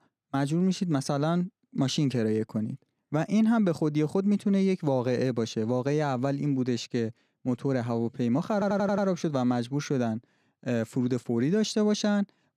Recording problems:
audio stuttering; at 8.5 s

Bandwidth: 15 kHz